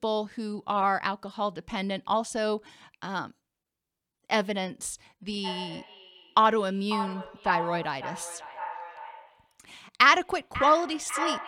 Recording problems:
echo of what is said; strong; from 5.5 s on; 540 ms later, 9 dB below the speech

